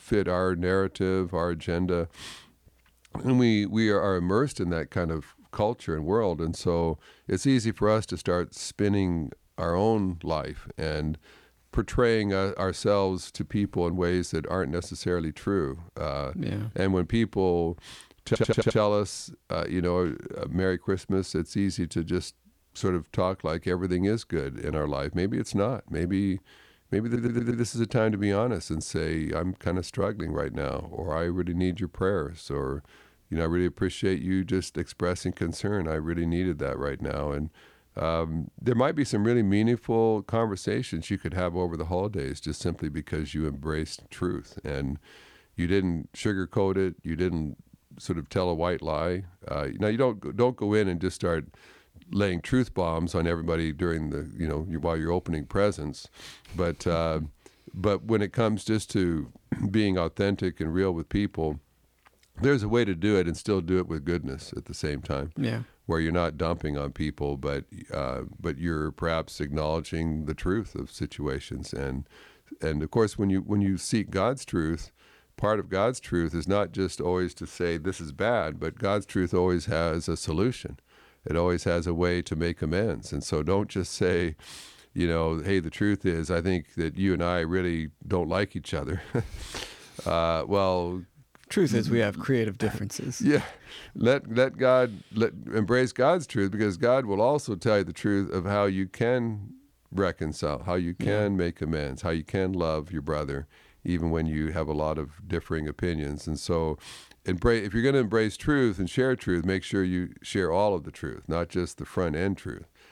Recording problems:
audio stuttering; at 18 s and at 27 s

